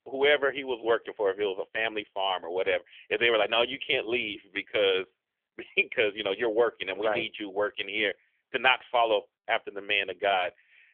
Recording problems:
phone-call audio; nothing above 3.5 kHz

